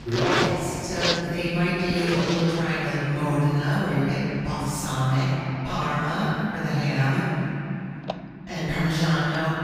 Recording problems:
room echo; strong; dies away in 3 s
off-mic speech; far
household noises; very faint; throughout; 6 dB below the speech

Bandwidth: 15.5 kHz